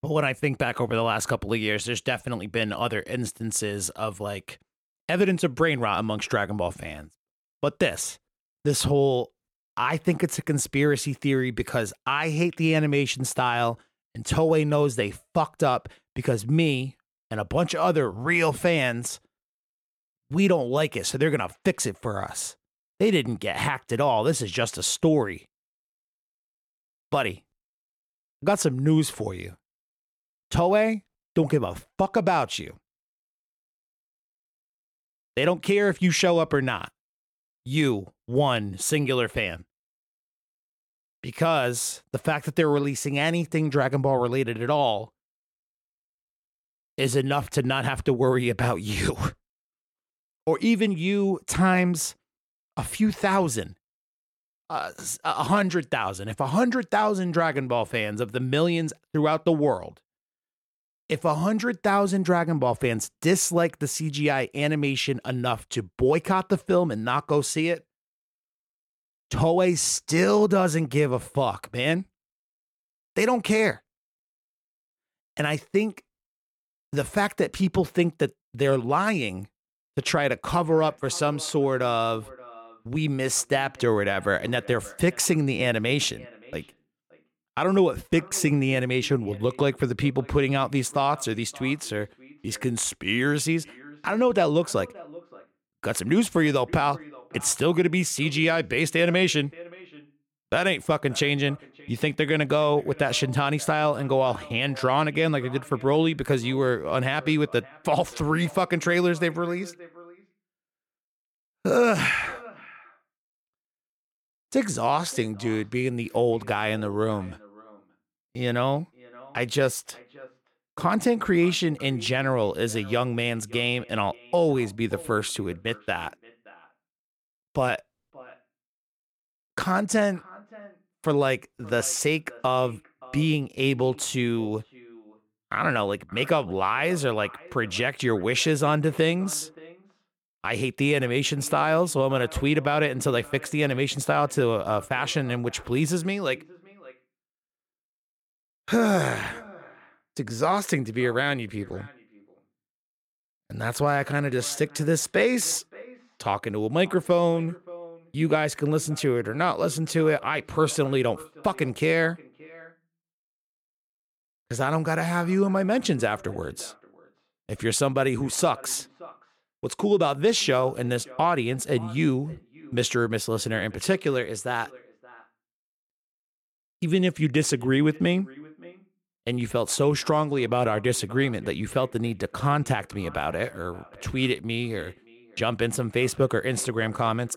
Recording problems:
echo of what is said; faint; from 1:21 on; 570 ms later, 25 dB below the speech

